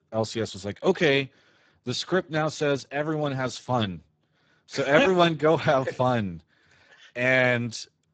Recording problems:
garbled, watery; badly; nothing above 7.5 kHz

